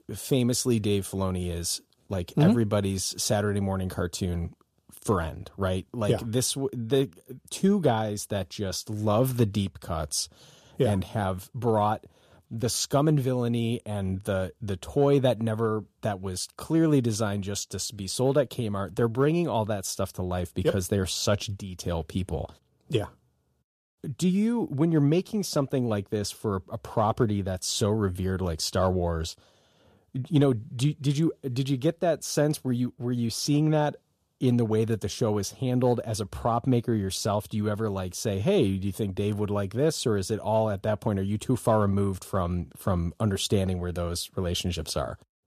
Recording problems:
none

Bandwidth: 14.5 kHz